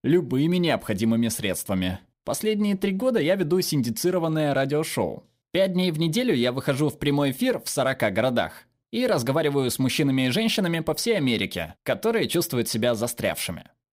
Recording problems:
none

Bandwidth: 15.5 kHz